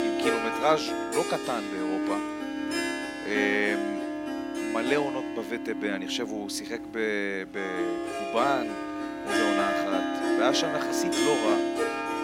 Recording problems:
background music; very loud; throughout; 1 dB above the speech
household noises; faint; throughout; 30 dB below the speech

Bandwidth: 16 kHz